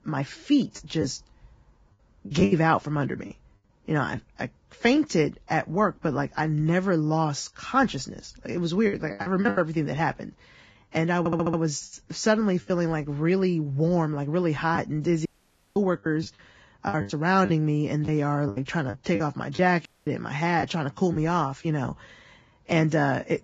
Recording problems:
garbled, watery; badly; nothing above 7.5 kHz
choppy; very; 7% of the speech affected
audio stuttering; at 11 s
audio cutting out; at 15 s for 0.5 s and at 20 s

